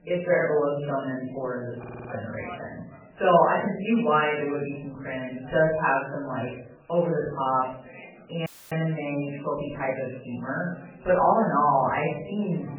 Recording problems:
off-mic speech; far
garbled, watery; badly; nothing above 3 kHz
room echo; noticeable; dies away in 0.5 s
background chatter; faint; throughout; 4 voices, 20 dB below the speech
audio stuttering; at 2 s
audio cutting out; at 8.5 s

